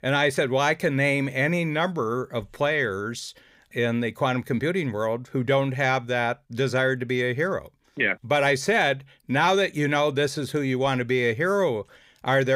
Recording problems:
abrupt cut into speech; at the end

